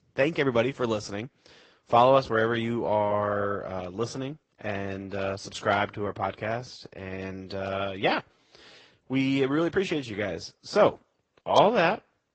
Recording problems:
high frequencies cut off; noticeable; nothing above 8 kHz
garbled, watery; slightly

